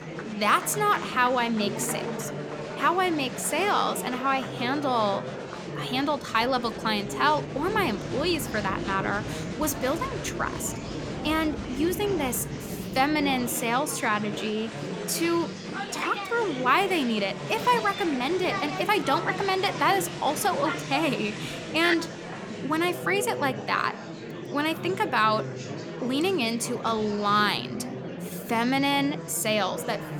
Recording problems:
murmuring crowd; loud; throughout; 8 dB below the speech

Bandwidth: 17.5 kHz